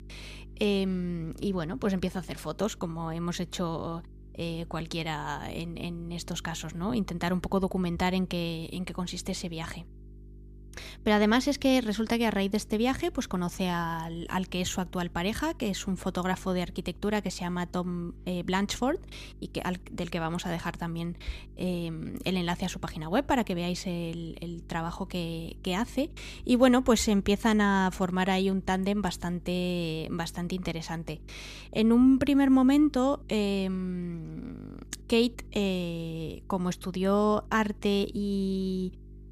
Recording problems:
electrical hum; faint; throughout; 50 Hz, 30 dB below the speech

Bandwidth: 15 kHz